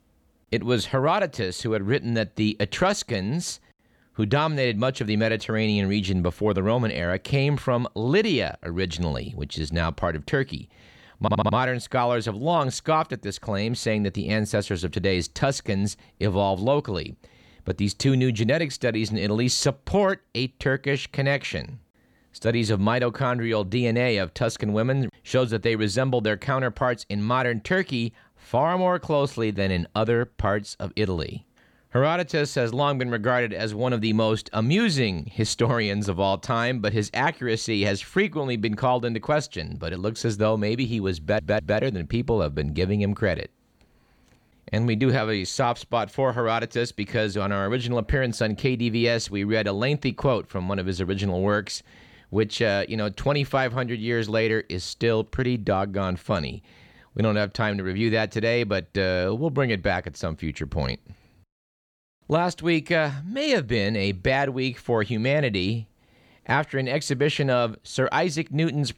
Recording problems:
audio stuttering; at 11 s and at 41 s

